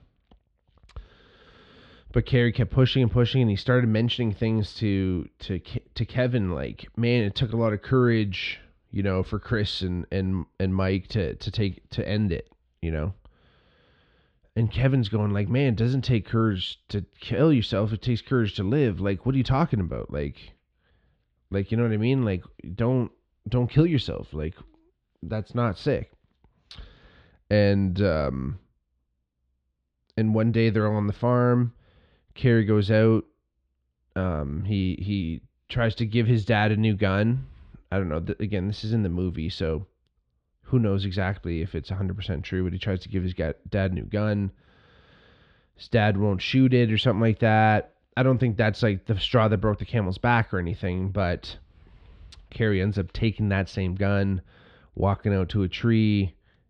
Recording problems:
muffled; slightly; fading above 3.5 kHz

